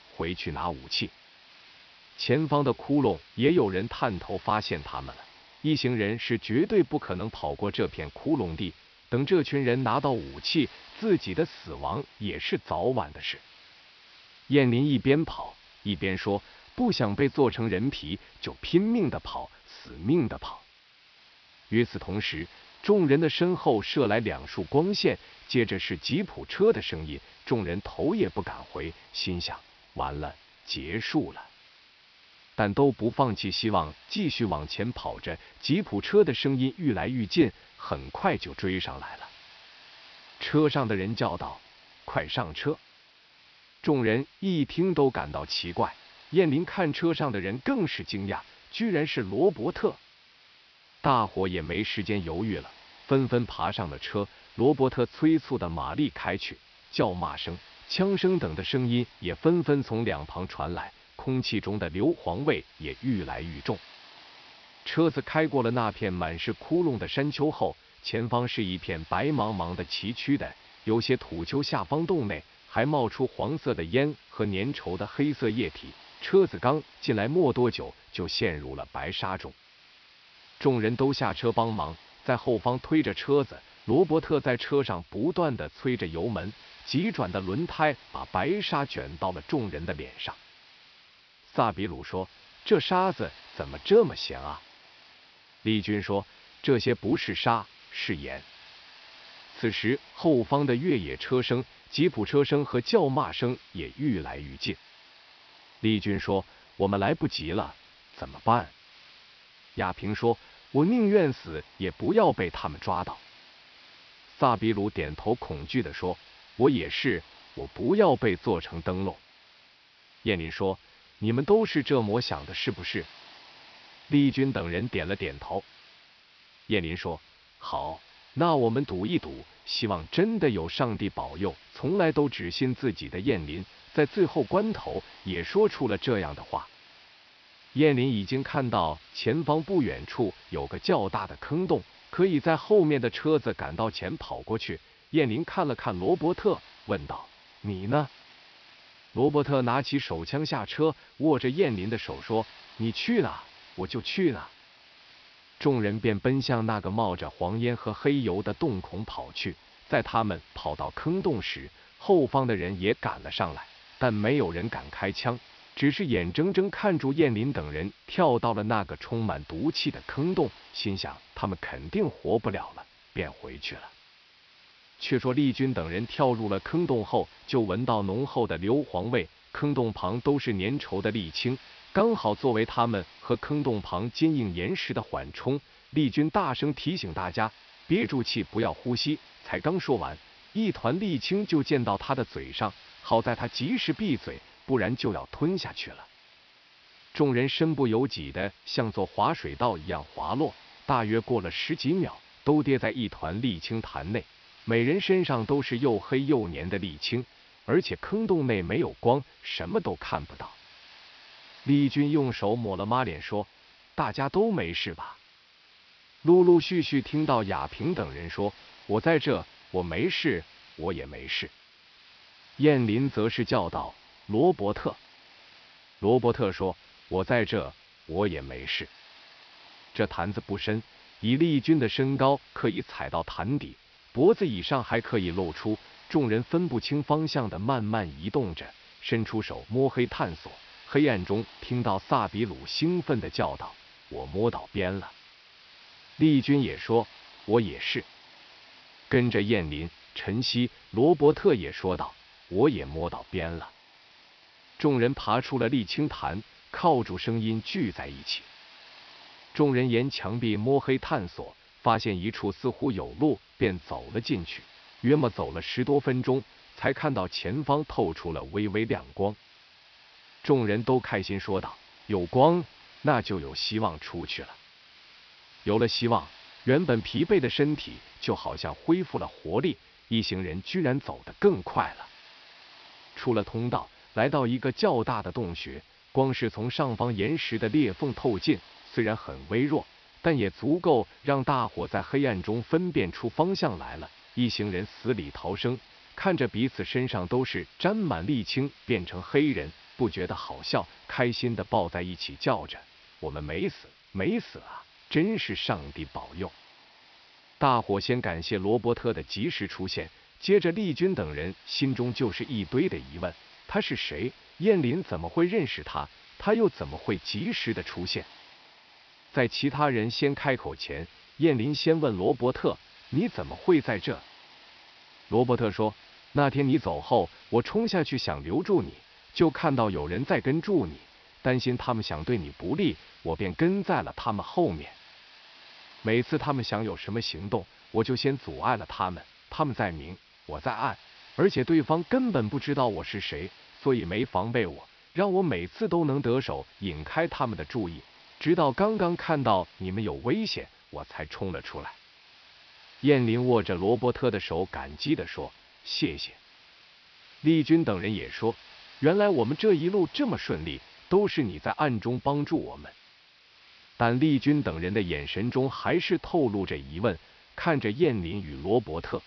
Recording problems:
high frequencies cut off; noticeable; nothing above 5.5 kHz
hiss; faint; throughout; 25 dB below the speech

